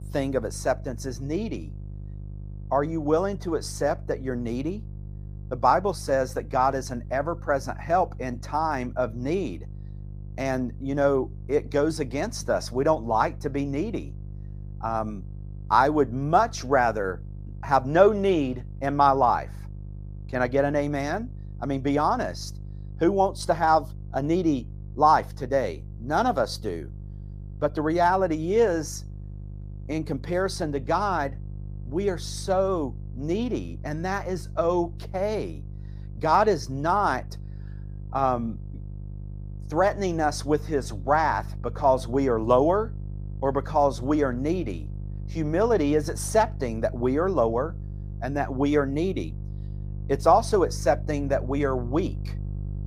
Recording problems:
electrical hum; faint; throughout; 50 Hz, 25 dB below the speech

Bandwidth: 15 kHz